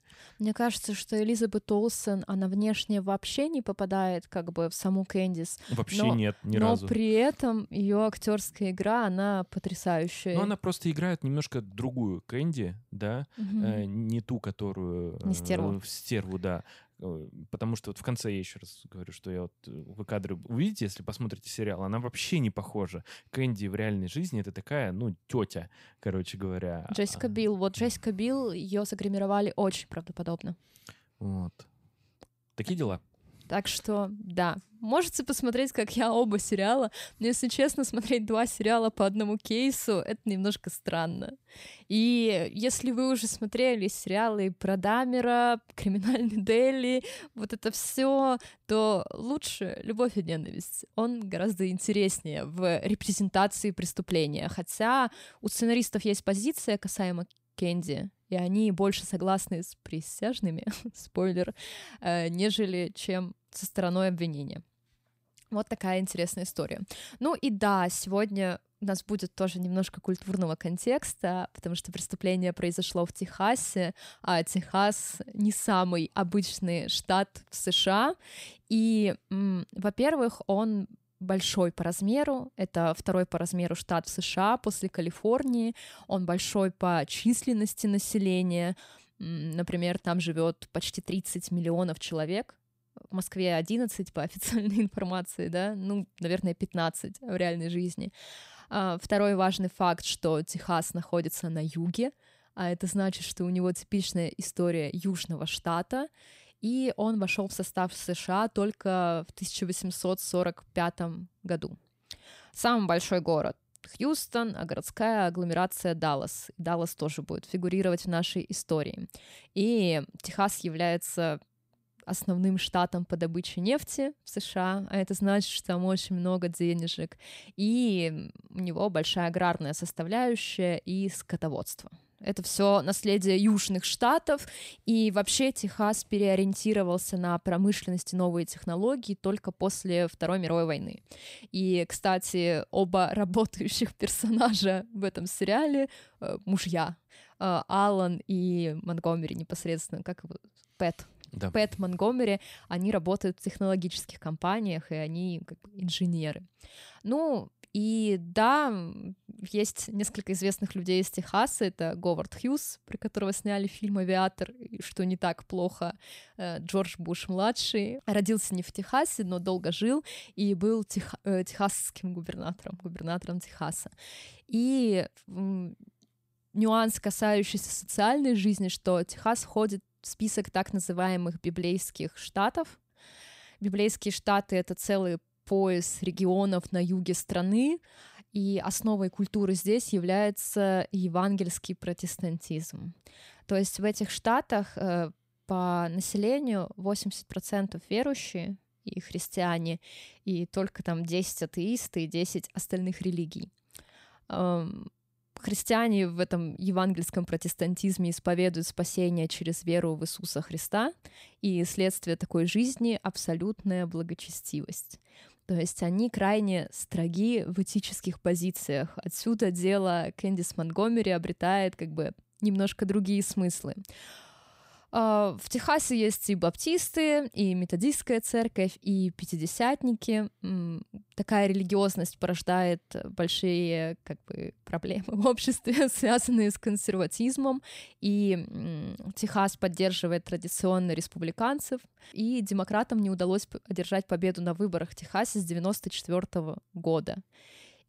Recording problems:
none

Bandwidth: 15.5 kHz